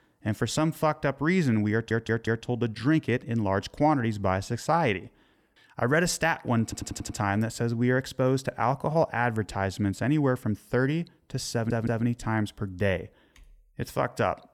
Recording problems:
audio stuttering; at 1.5 s, at 6.5 s and at 12 s

